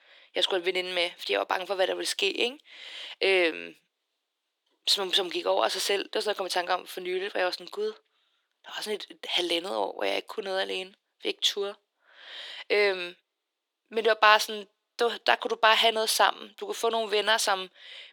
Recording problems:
thin; very; fading below 300 Hz

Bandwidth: 18.5 kHz